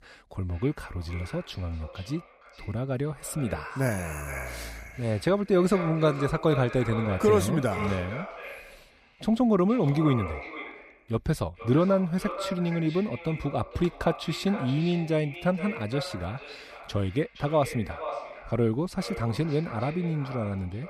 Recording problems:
echo of what is said; strong; throughout; 460 ms later, 10 dB below the speech

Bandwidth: 15 kHz